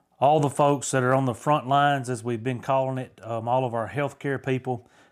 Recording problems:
none

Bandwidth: 15 kHz